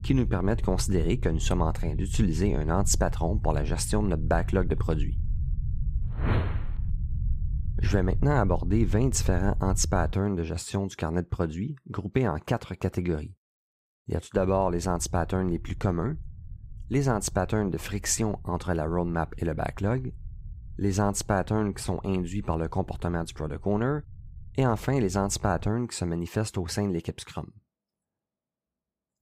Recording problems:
low rumble; faint; until 10 s and from 14 to 26 s; 20 dB below the speech

